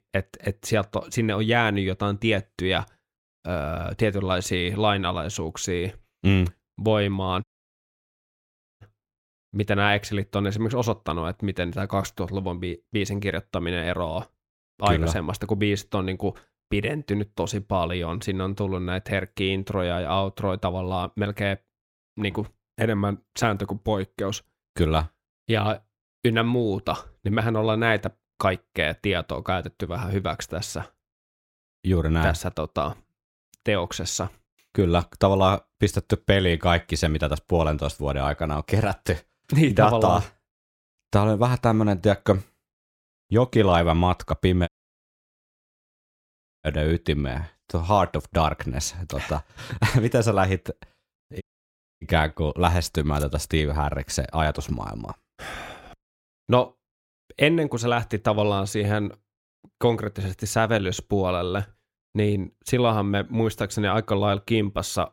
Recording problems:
audio cutting out; at 7.5 s for 1.5 s, at 45 s for 2 s and at 51 s for 0.5 s

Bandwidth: 16.5 kHz